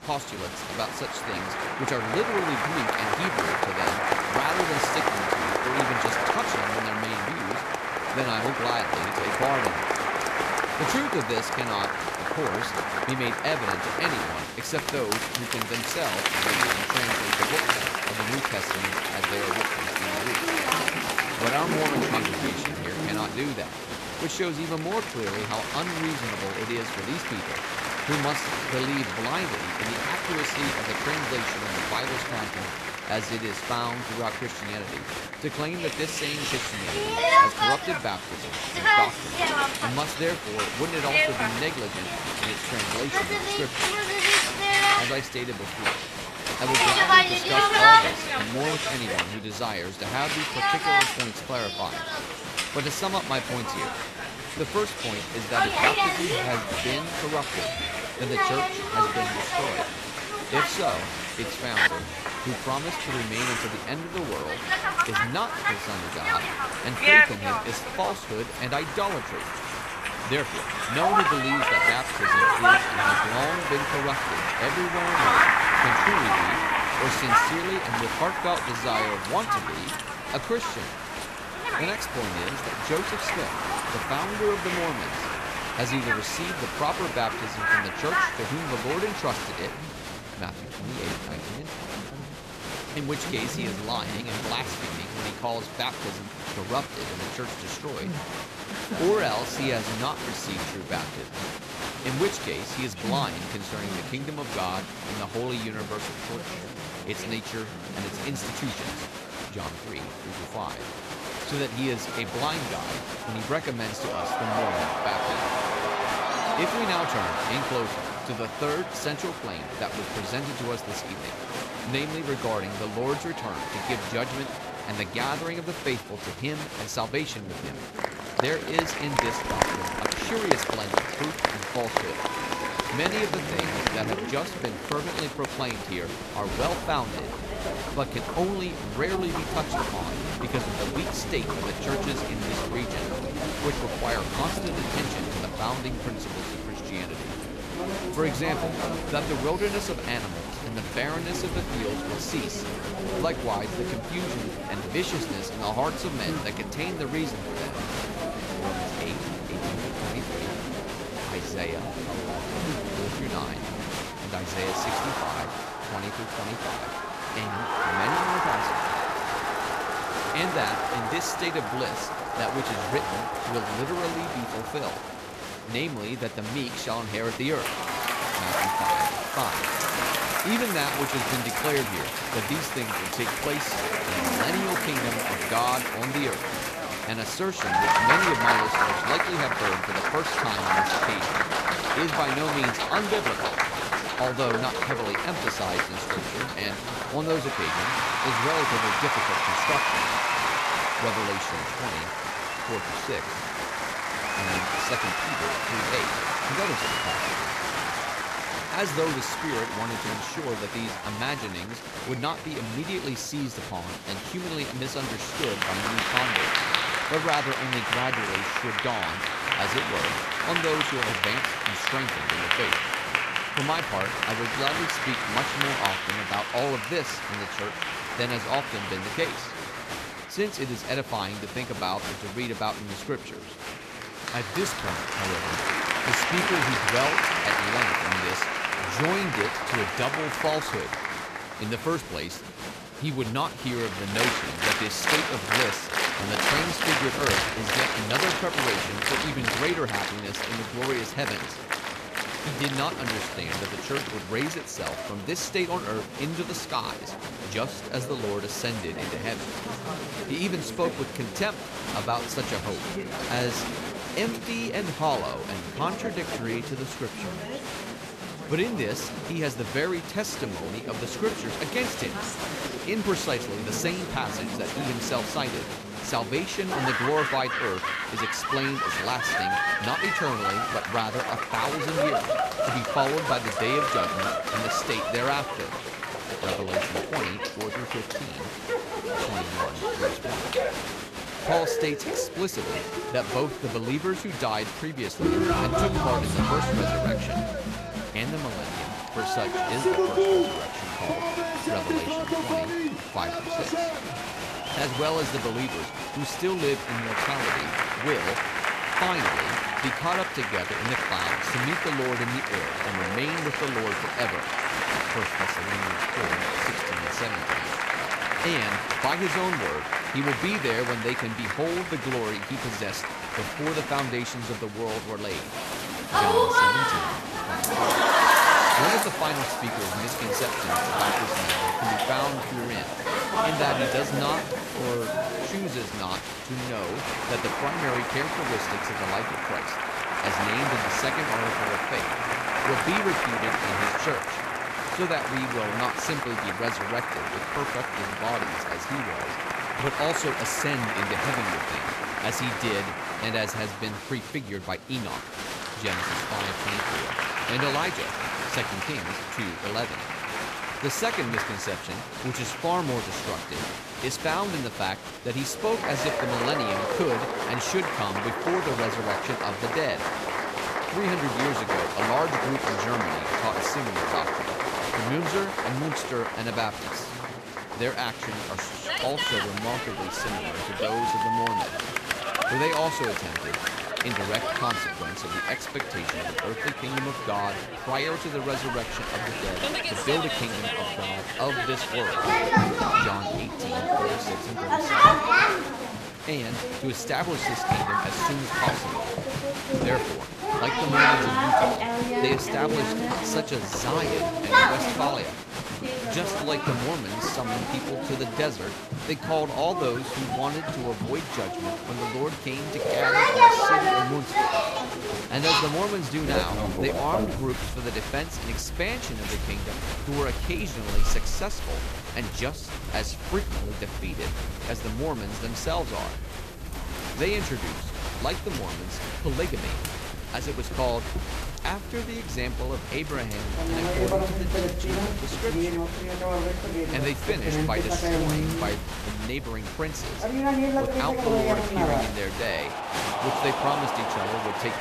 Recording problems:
crowd noise; very loud; throughout; 4 dB above the speech
murmuring crowd; noticeable; throughout; 15 dB below the speech

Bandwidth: 14 kHz